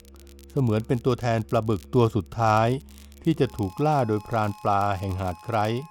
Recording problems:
background music; faint; throughout; 25 dB below the speech
crackle, like an old record; faint; 25 dB below the speech

